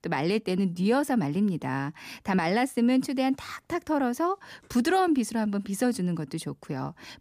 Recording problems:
none

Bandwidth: 15 kHz